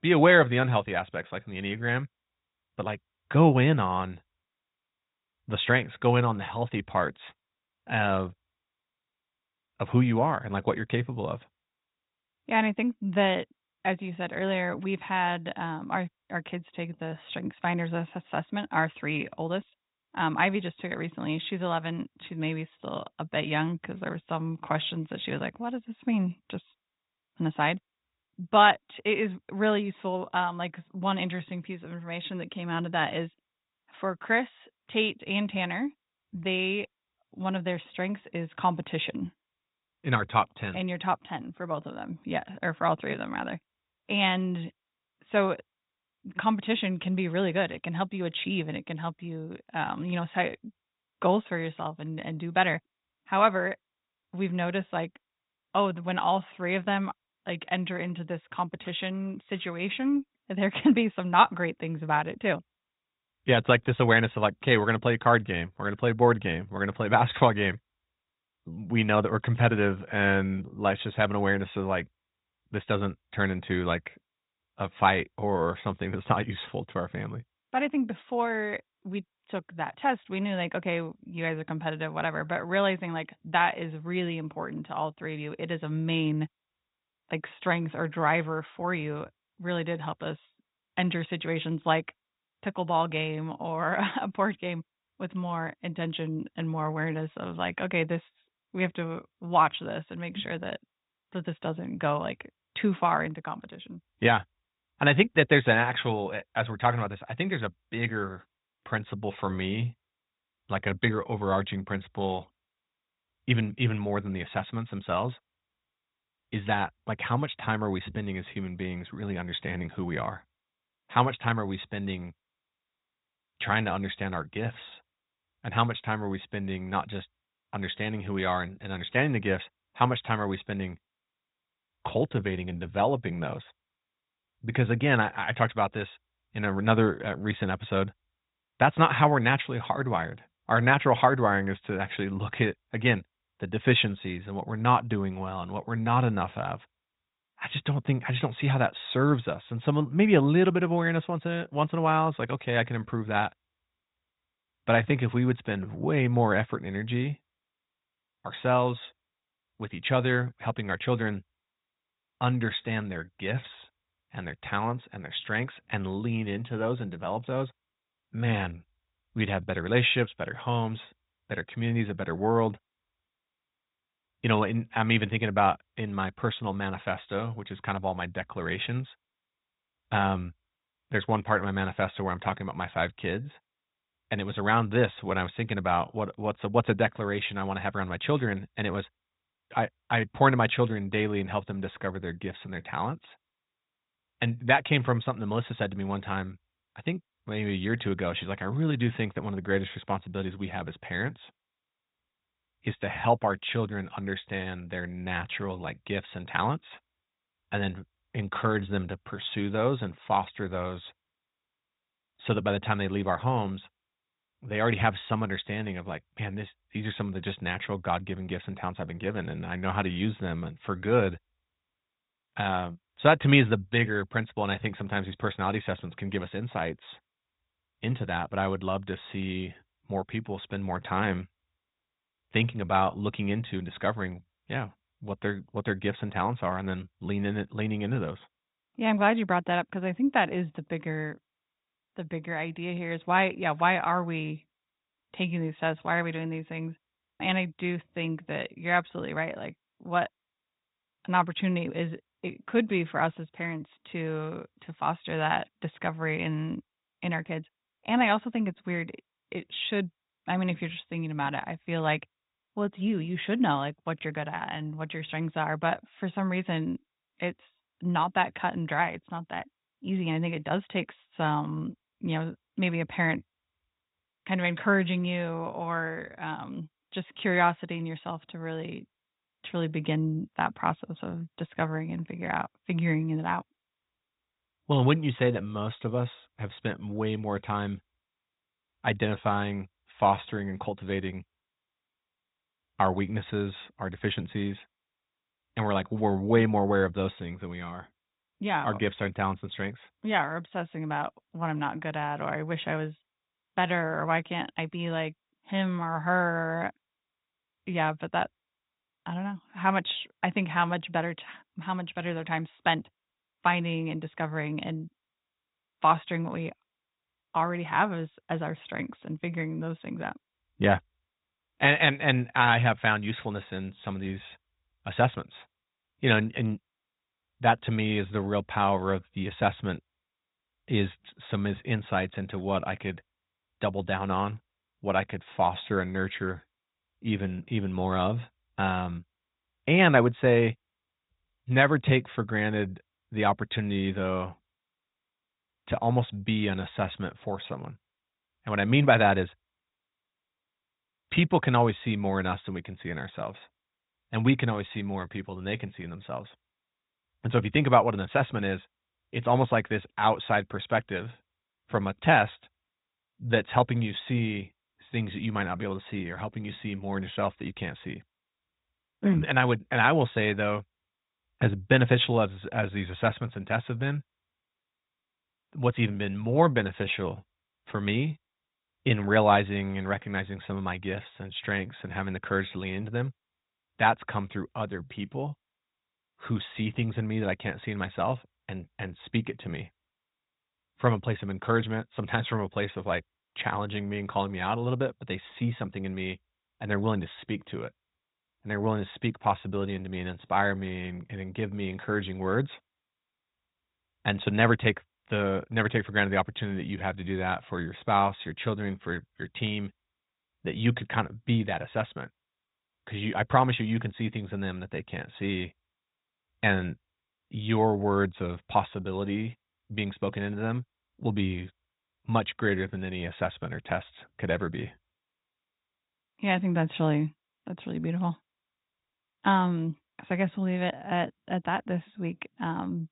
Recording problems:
high frequencies cut off; severe; nothing above 4 kHz
garbled, watery; slightly

